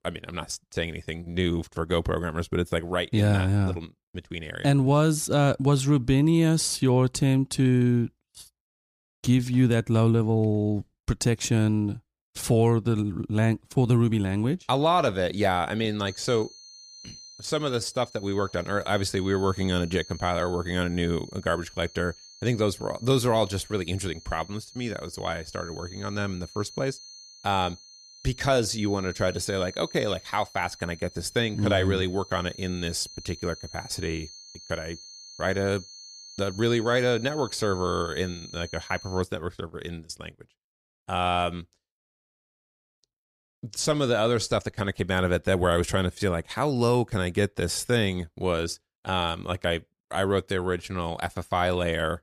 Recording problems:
high-pitched whine; noticeable; from 16 to 39 s; 4.5 kHz, 20 dB below the speech

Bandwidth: 15 kHz